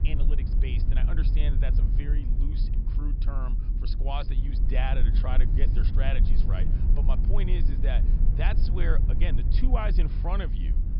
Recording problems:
high frequencies cut off; noticeable; nothing above 5.5 kHz
low rumble; loud; throughout; 6 dB below the speech

